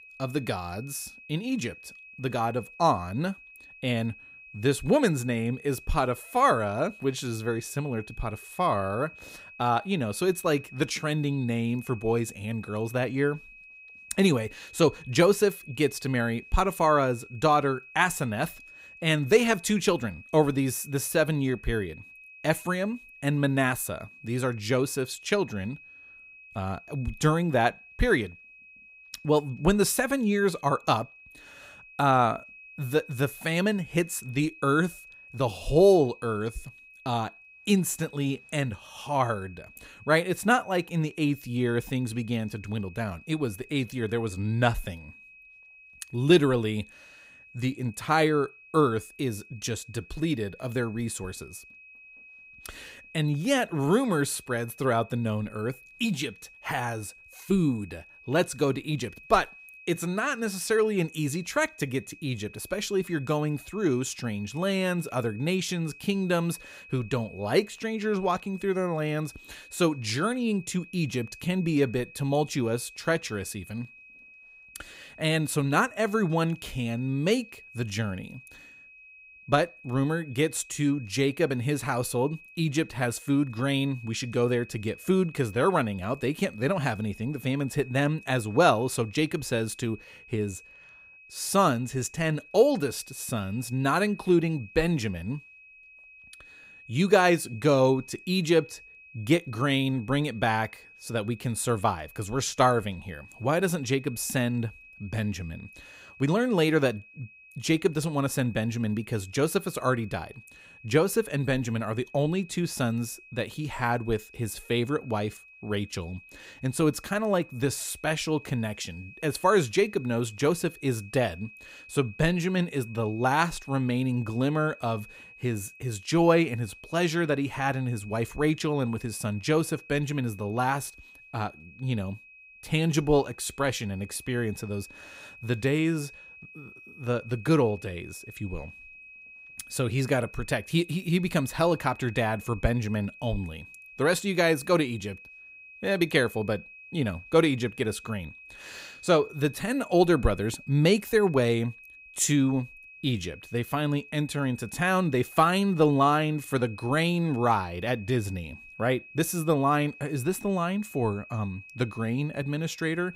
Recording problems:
high-pitched whine; faint; throughout; 2.5 kHz, 20 dB below the speech

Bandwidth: 15.5 kHz